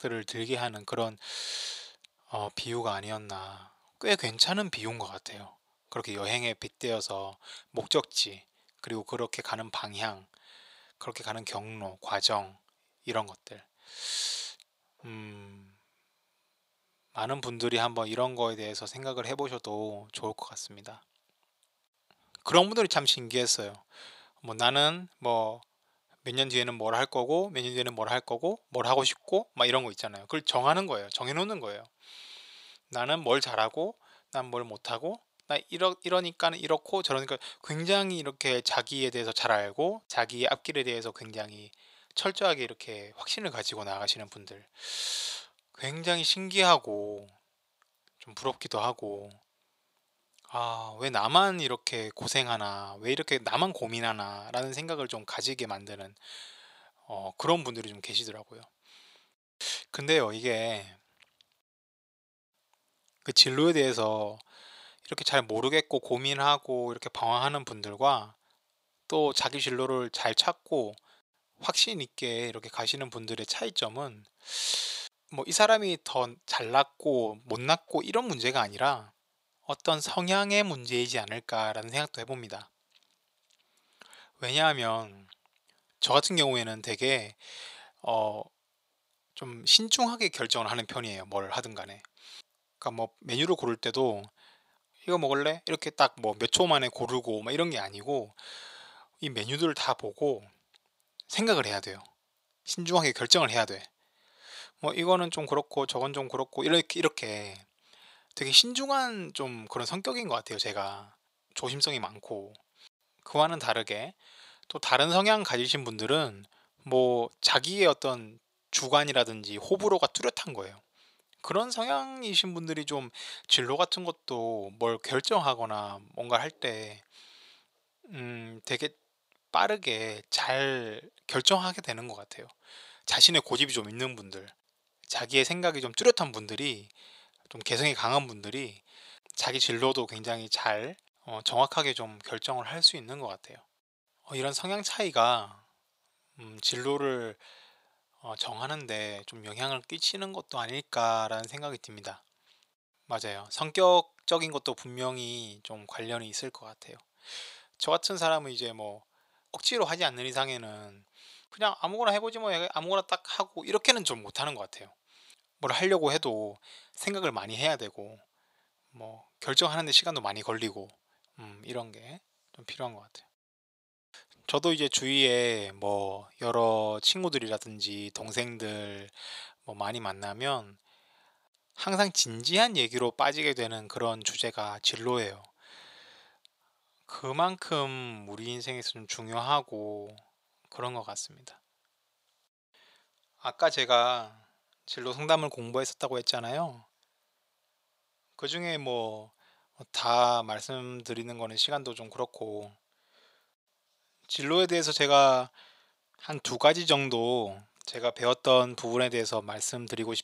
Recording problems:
thin; very; fading below 500 Hz

